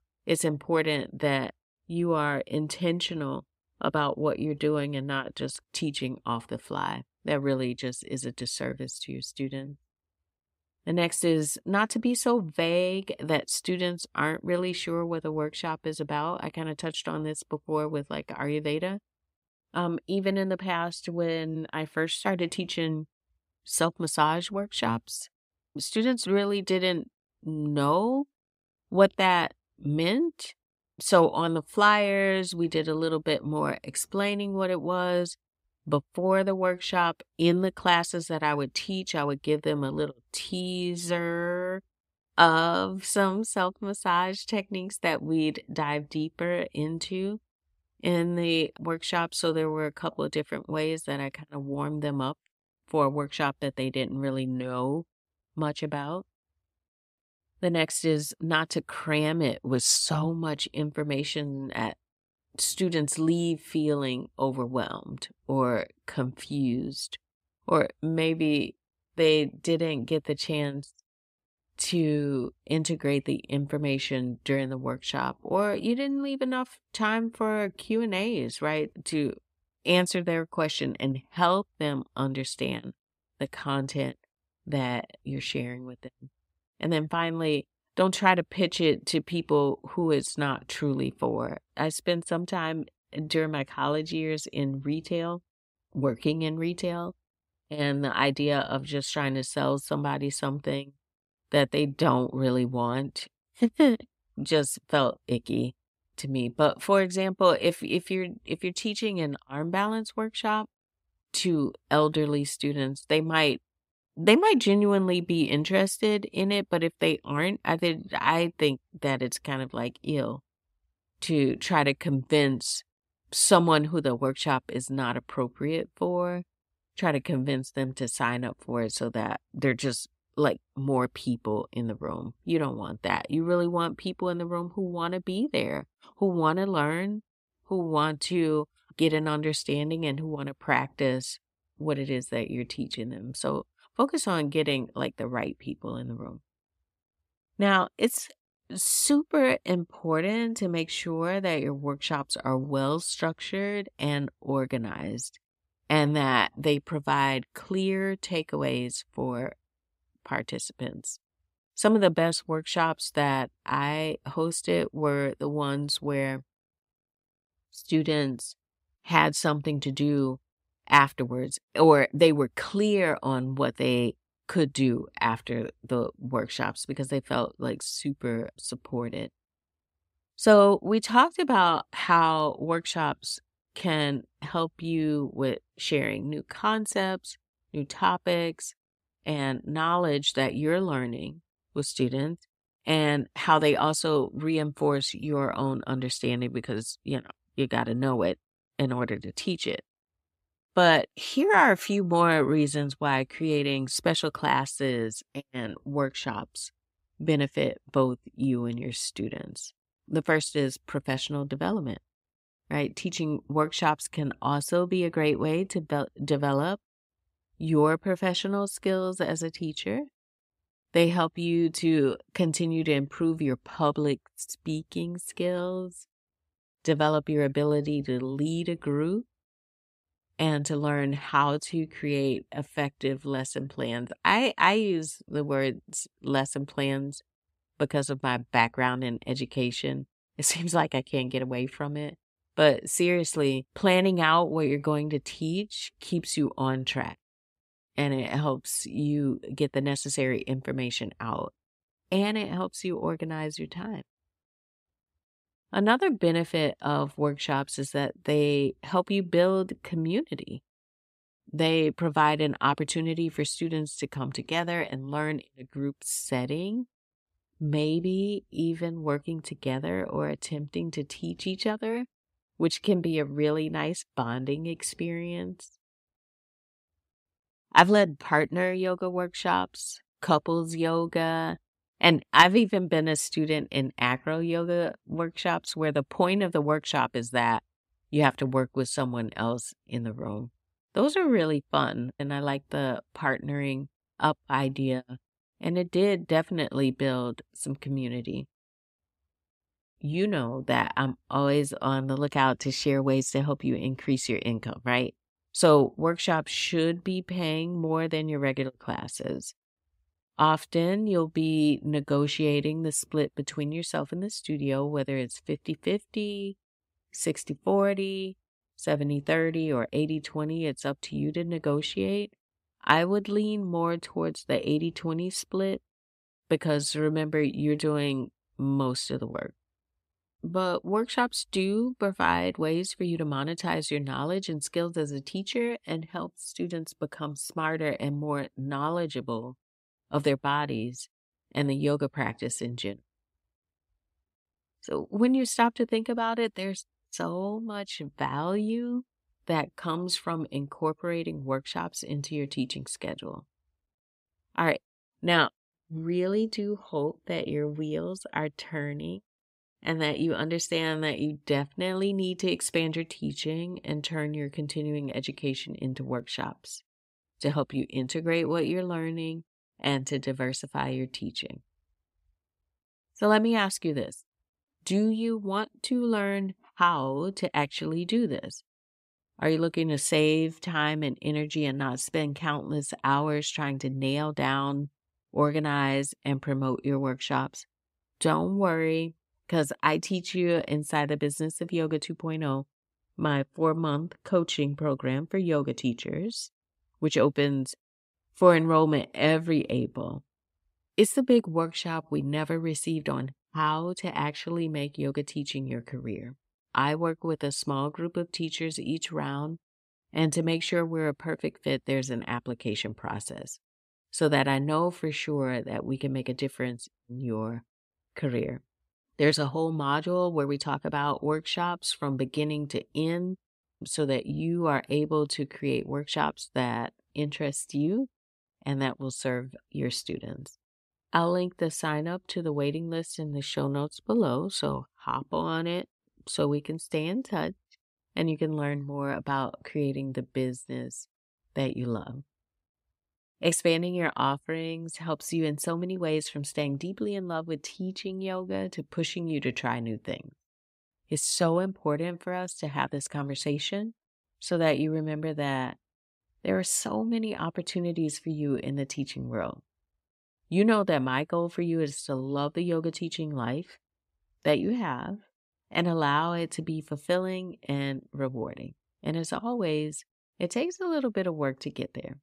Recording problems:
none

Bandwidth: 15.5 kHz